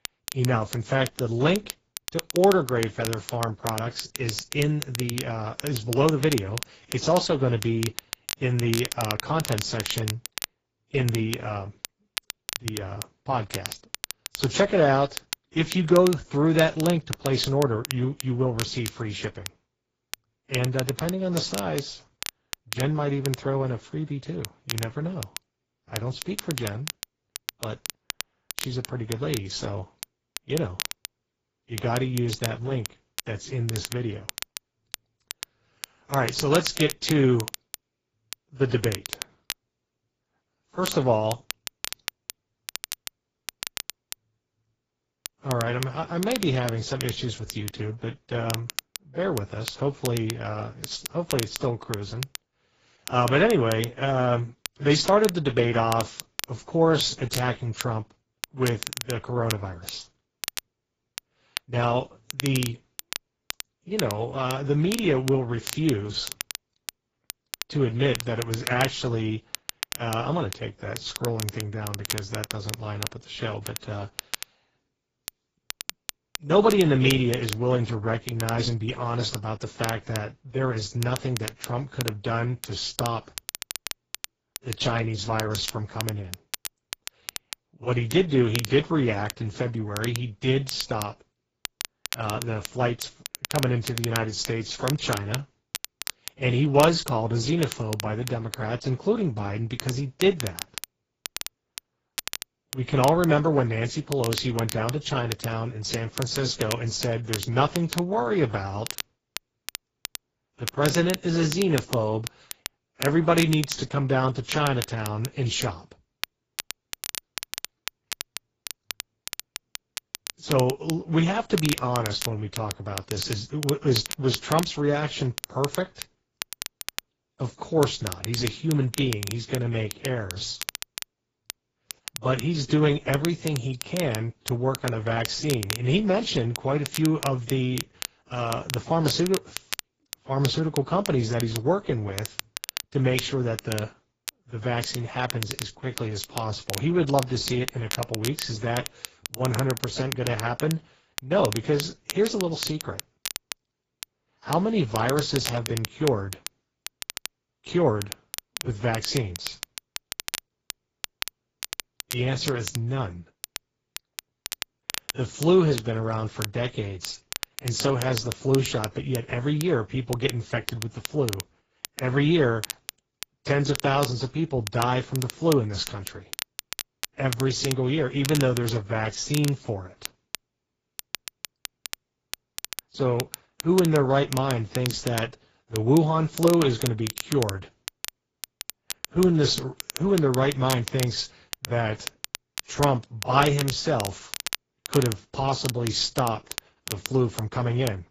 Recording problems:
garbled, watery; badly; nothing above 7.5 kHz
crackle, like an old record; loud; 10 dB below the speech

